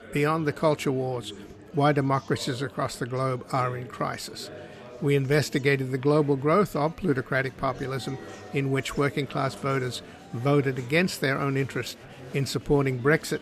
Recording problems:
murmuring crowd; noticeable; throughout; 20 dB below the speech

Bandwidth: 14.5 kHz